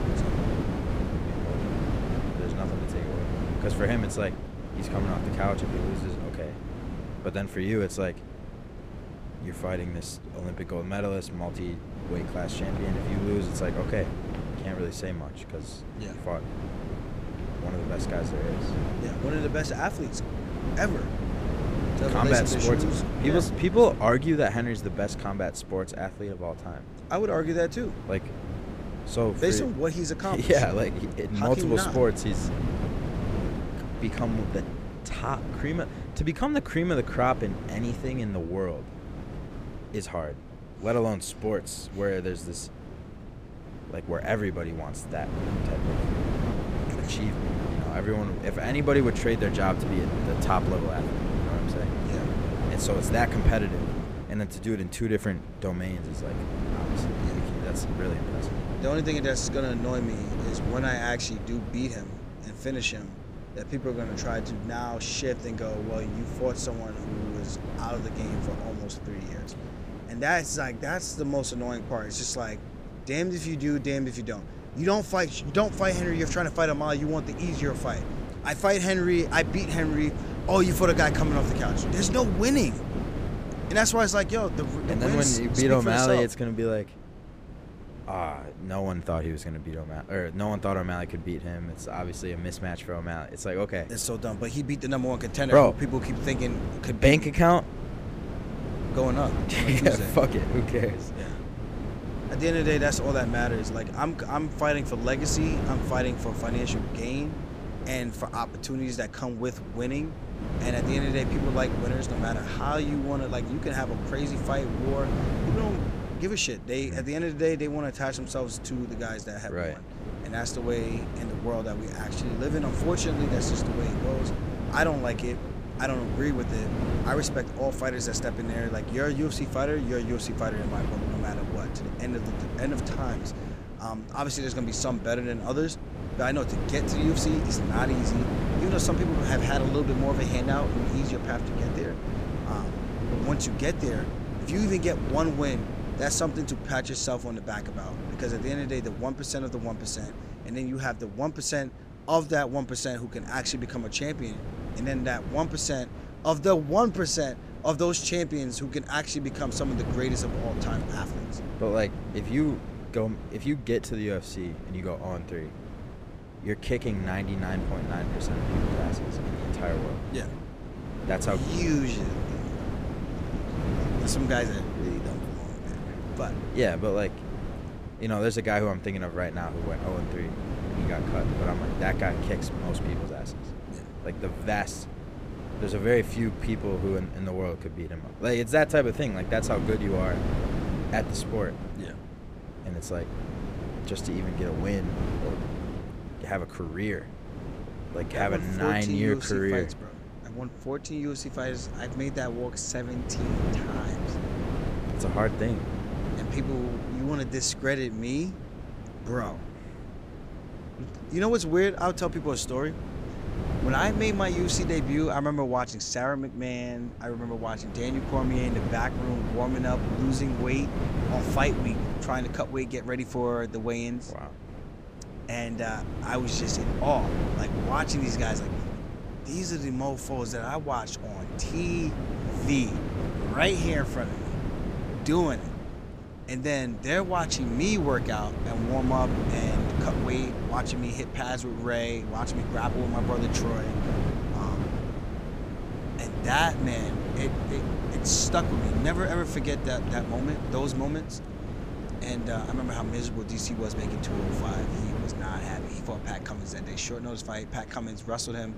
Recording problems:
wind noise on the microphone; heavy; 8 dB below the speech

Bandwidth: 15 kHz